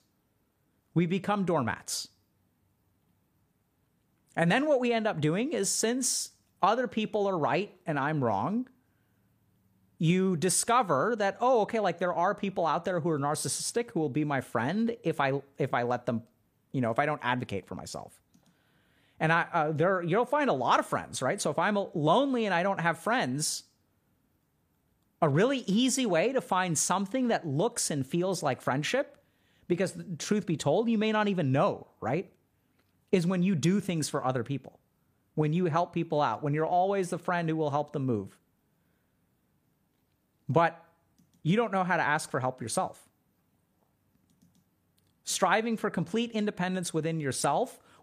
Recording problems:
none

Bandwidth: 15 kHz